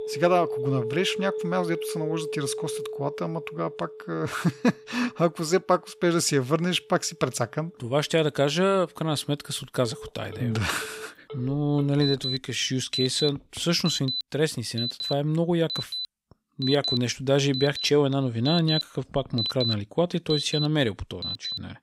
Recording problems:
alarms or sirens; loud; throughout; 5 dB below the speech

